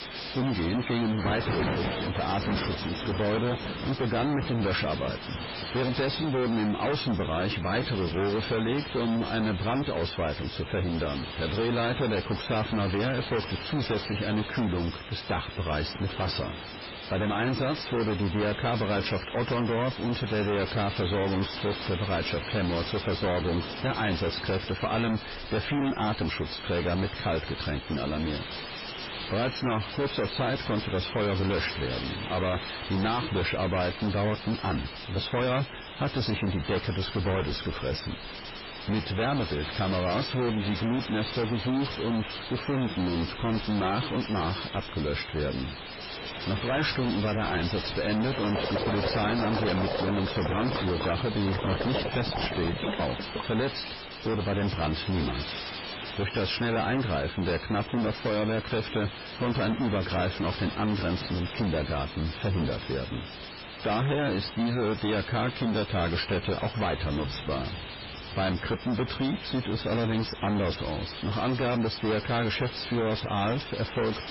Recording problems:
distortion; heavy; 27% of the sound clipped
garbled, watery; badly; nothing above 5.5 kHz
rain or running water; loud; throughout; 9 dB below the speech
hiss; loud; throughout; 9 dB below the speech

